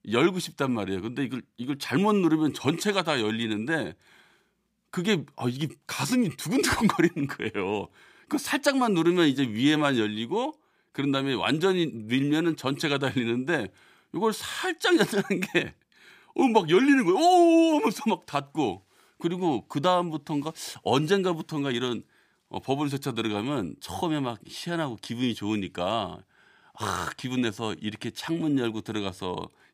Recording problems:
none

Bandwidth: 15 kHz